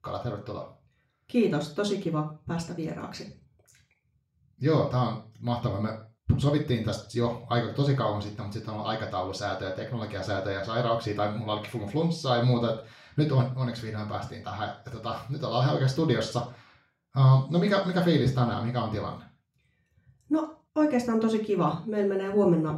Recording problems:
off-mic speech; far
room echo; slight; dies away in 0.4 s

